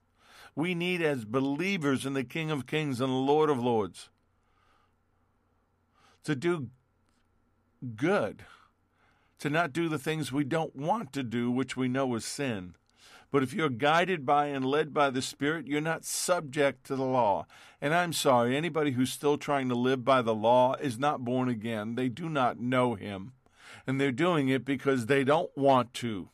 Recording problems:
none

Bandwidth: 14.5 kHz